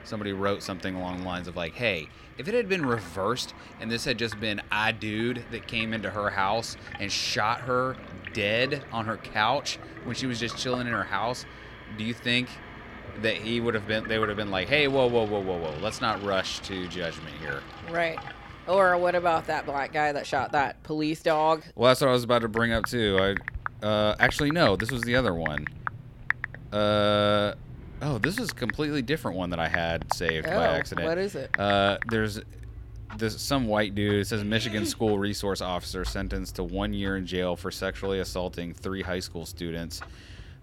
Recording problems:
household noises; noticeable; throughout; 10 dB below the speech

